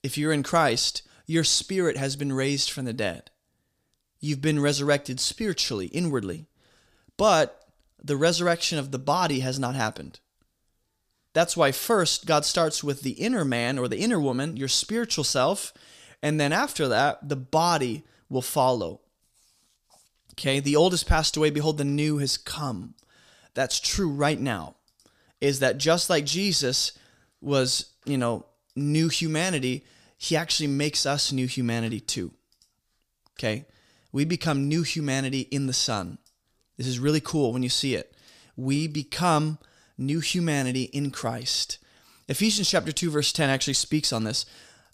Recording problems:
none

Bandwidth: 15 kHz